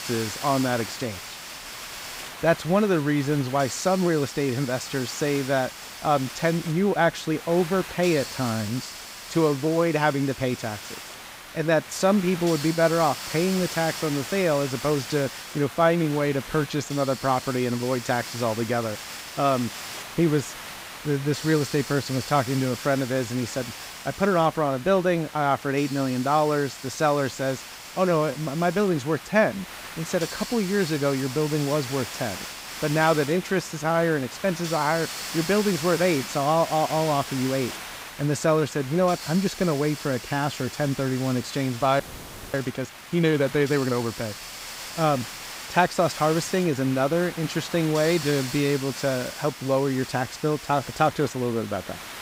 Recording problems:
hiss; noticeable; throughout; 10 dB below the speech
audio freezing; at 42 s for 0.5 s

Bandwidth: 15.5 kHz